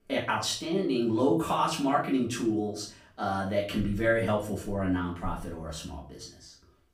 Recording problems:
off-mic speech; far
room echo; slight; dies away in 0.4 s

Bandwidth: 15.5 kHz